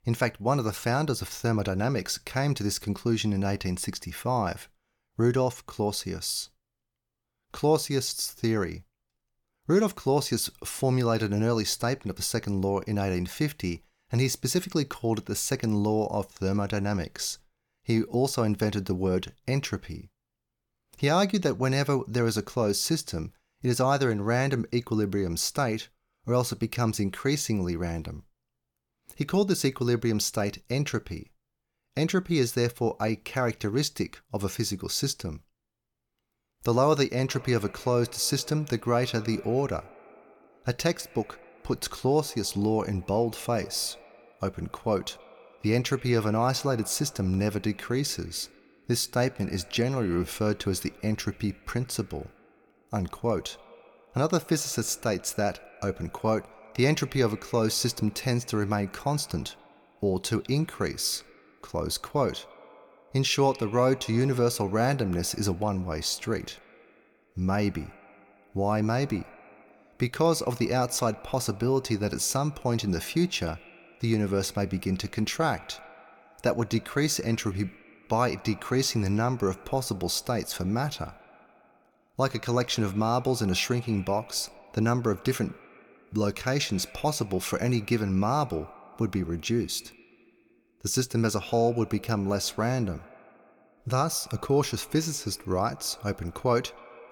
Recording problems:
echo of what is said; faint; from 37 s on; 130 ms later, 25 dB below the speech

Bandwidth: 18 kHz